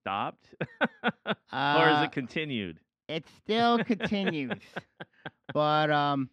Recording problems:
muffled; slightly; fading above 3 kHz

